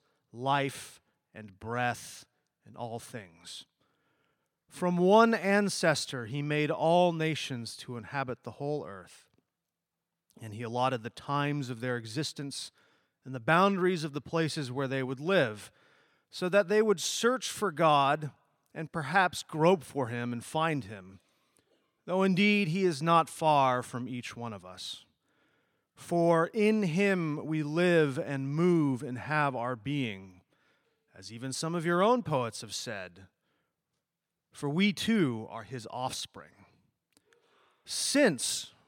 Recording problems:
none

